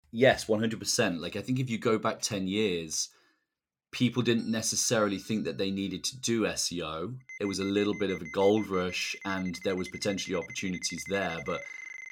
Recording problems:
alarms or sirens; noticeable; from 4 s on; 15 dB below the speech

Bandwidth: 17 kHz